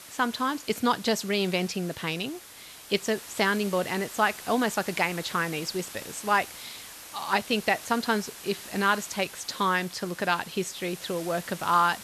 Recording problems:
hiss; noticeable; throughout; 15 dB below the speech

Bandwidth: 13.5 kHz